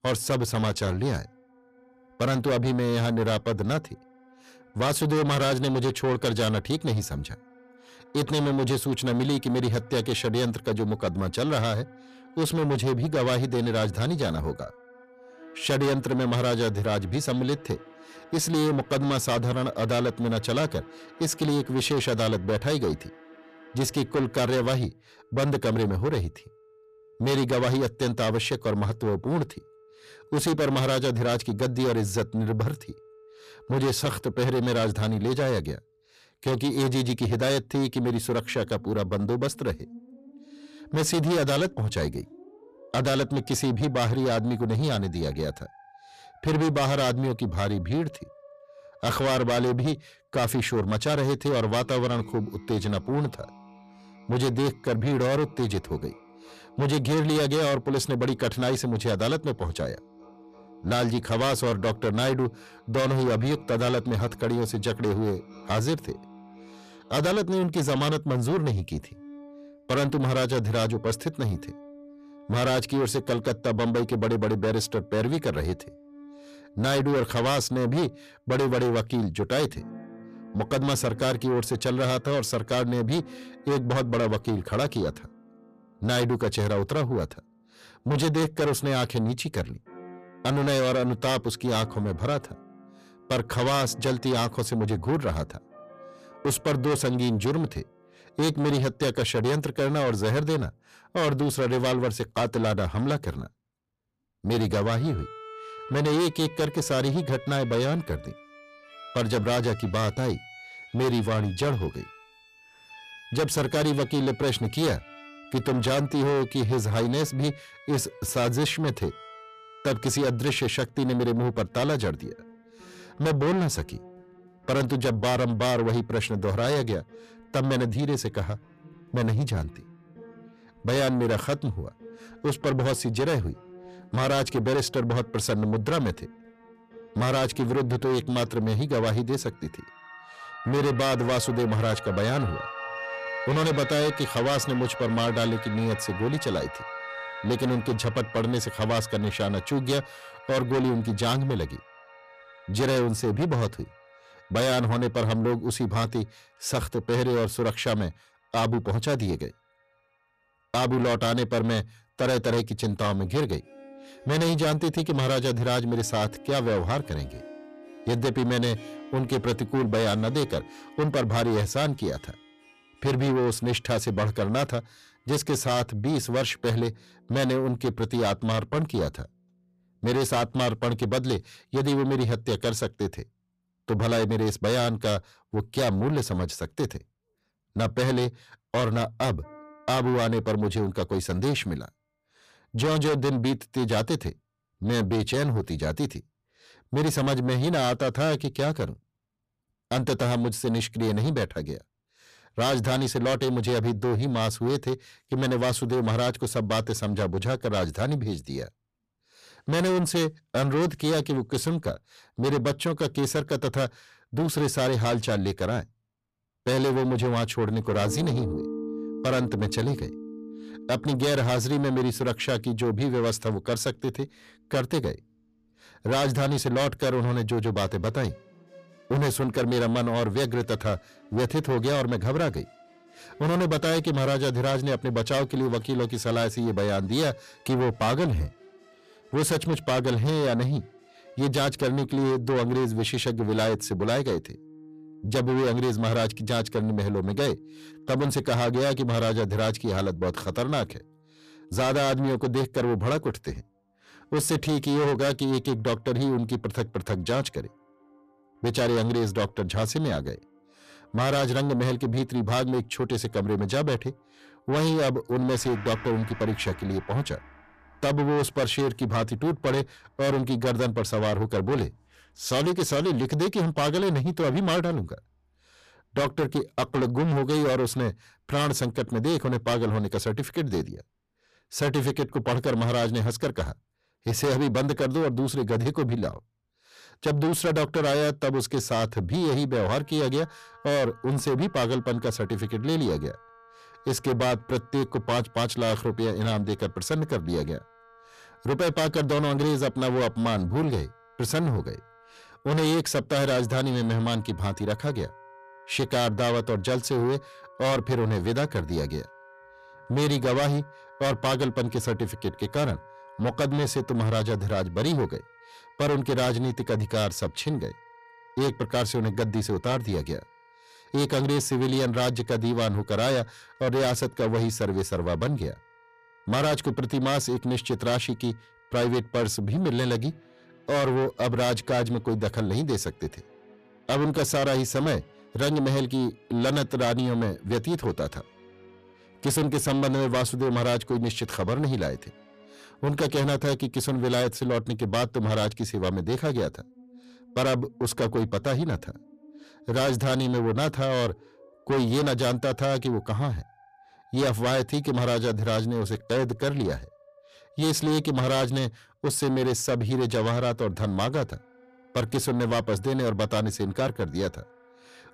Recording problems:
distortion; heavy; 6 dB below the speech
background music; faint; throughout; 20 dB below the speech

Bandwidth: 14.5 kHz